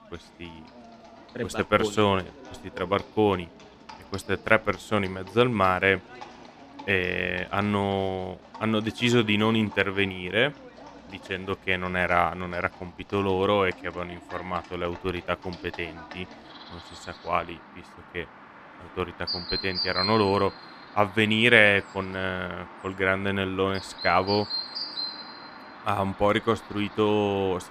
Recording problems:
animal sounds; noticeable; throughout; 15 dB below the speech

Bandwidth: 14.5 kHz